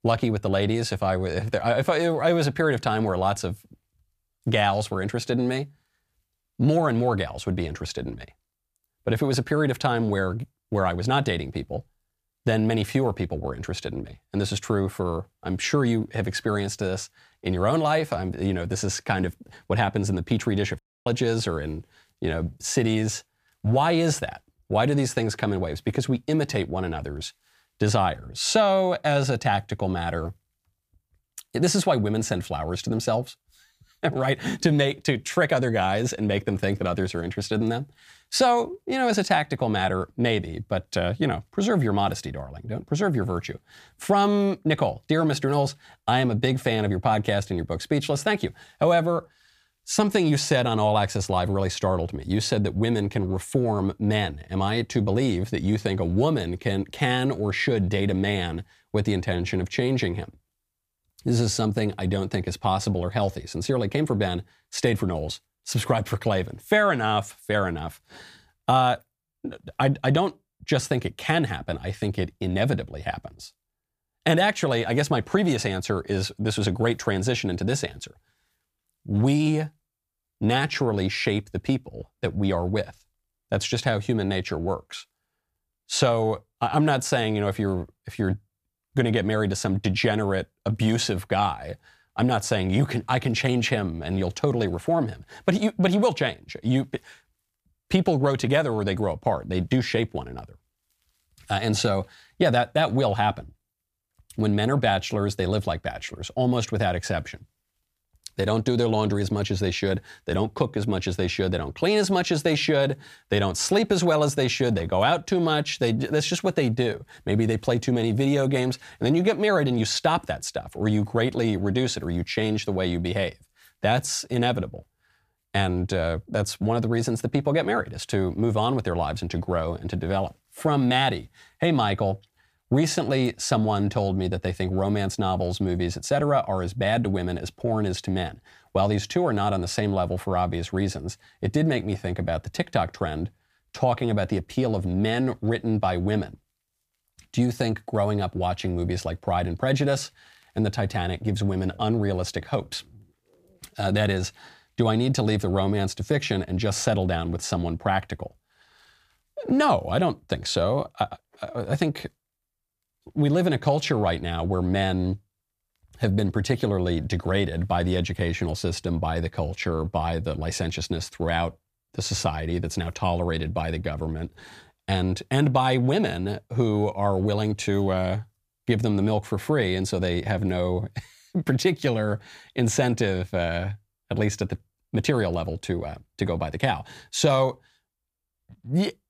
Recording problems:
audio cutting out; at 21 s

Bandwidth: 15 kHz